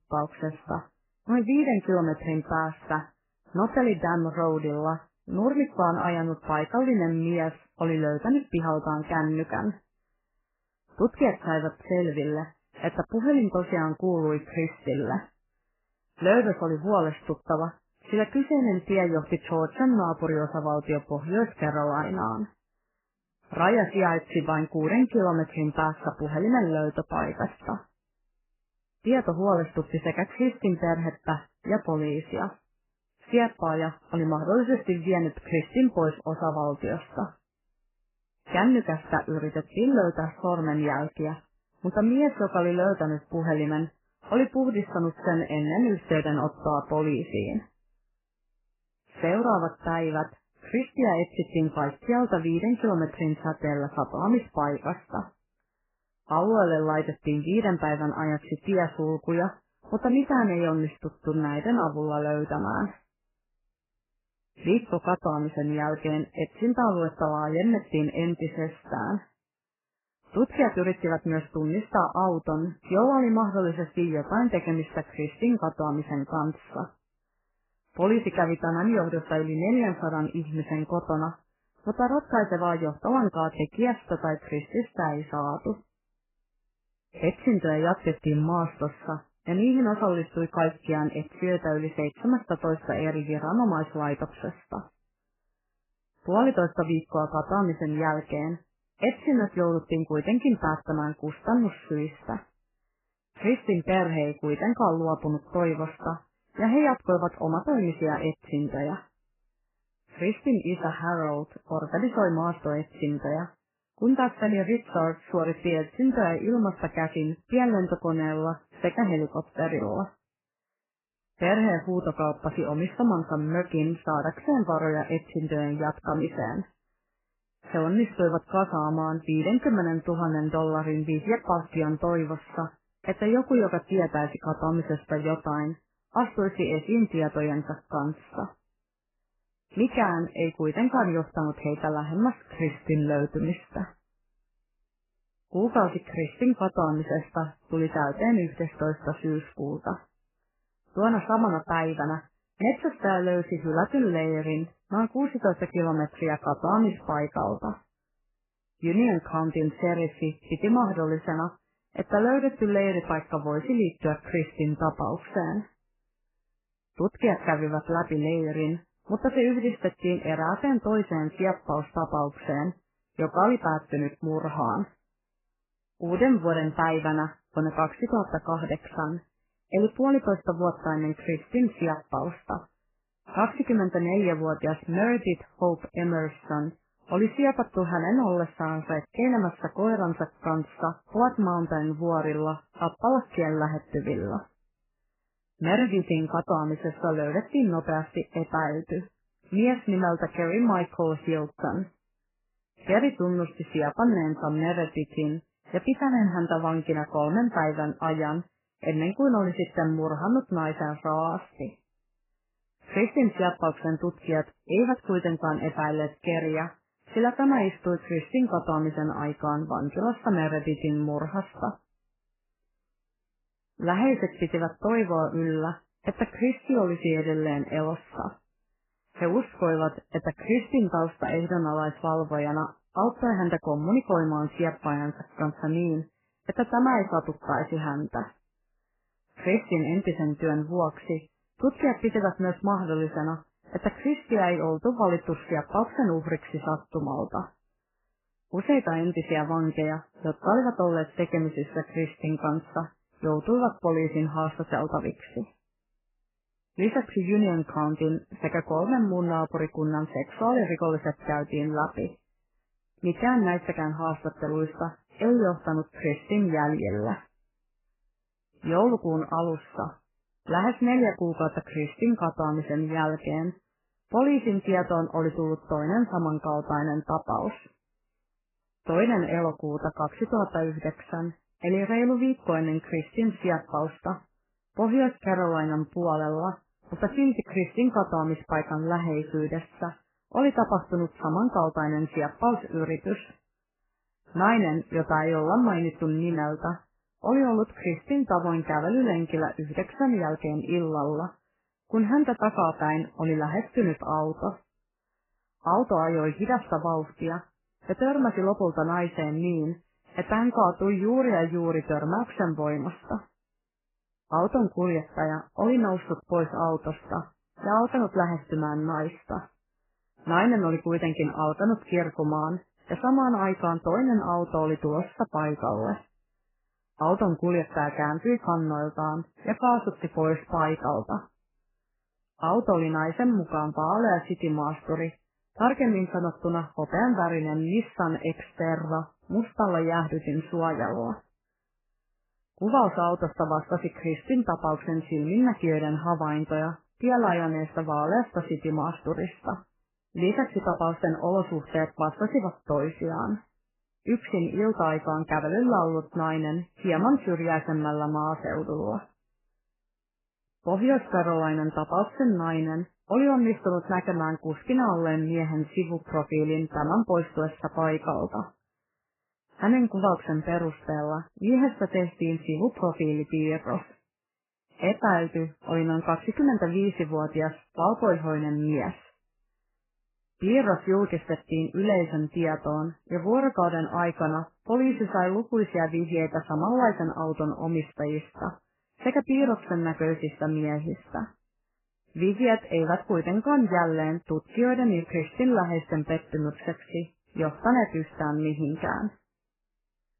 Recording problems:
garbled, watery; badly; nothing above 3 kHz

